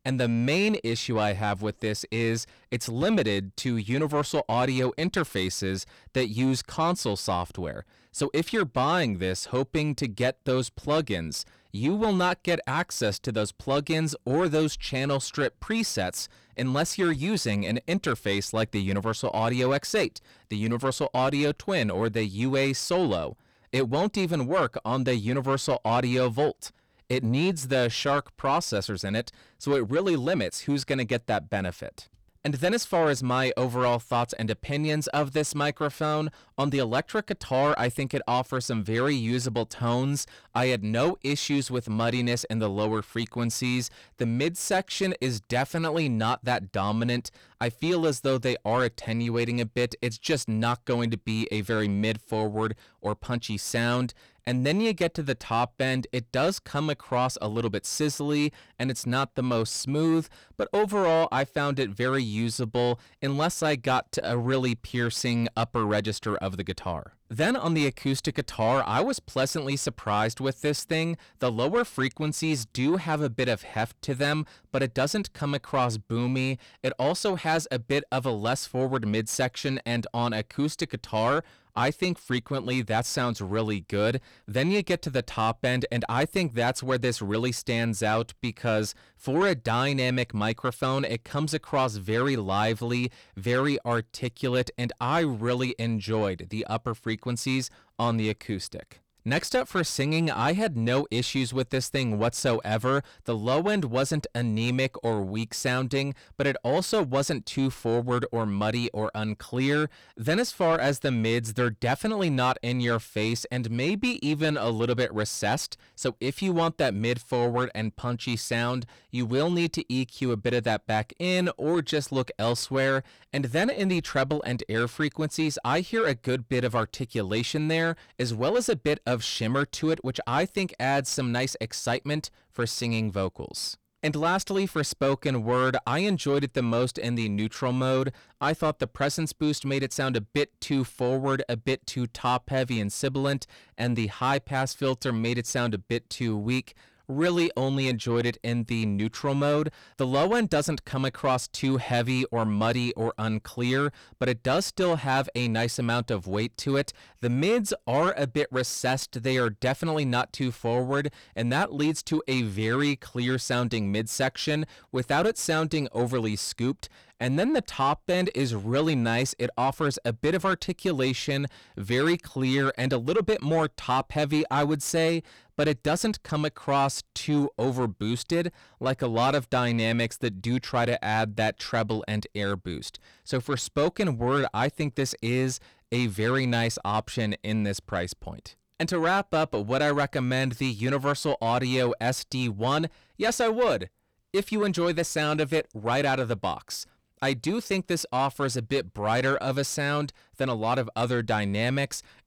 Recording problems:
distortion; slight; 10 dB below the speech

